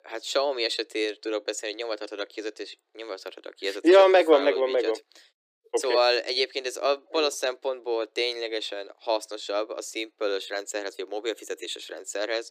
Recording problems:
thin; very; fading below 300 Hz

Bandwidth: 15 kHz